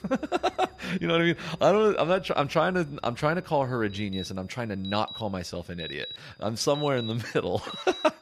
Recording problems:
alarms or sirens; noticeable; throughout; 15 dB below the speech
high-pitched whine; faint; throughout; 5 kHz, 35 dB below the speech

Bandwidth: 14.5 kHz